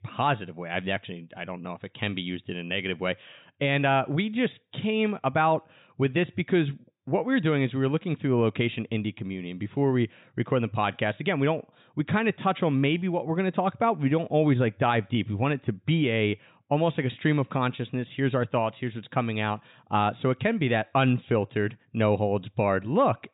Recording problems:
high frequencies cut off; severe; nothing above 4 kHz

